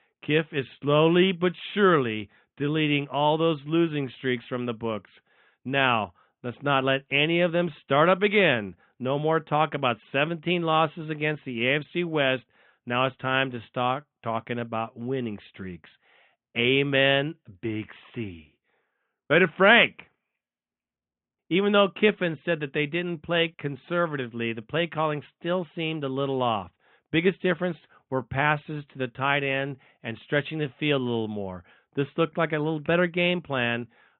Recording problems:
high frequencies cut off; severe; nothing above 3.5 kHz

